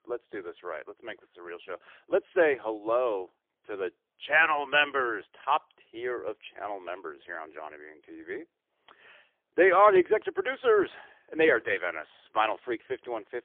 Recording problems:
phone-call audio; poor line; nothing above 3 kHz

